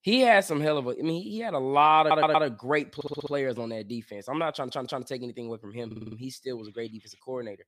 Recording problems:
audio stuttering; 4 times, first at 2 s

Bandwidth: 15 kHz